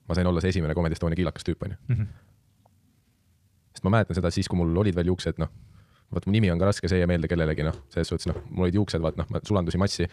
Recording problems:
wrong speed, natural pitch; too fast; 1.7 times normal speed

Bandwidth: 14.5 kHz